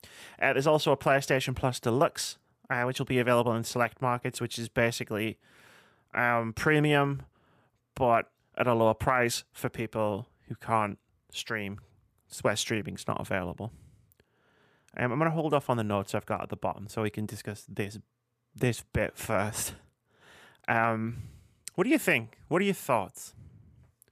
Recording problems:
none

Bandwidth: 15 kHz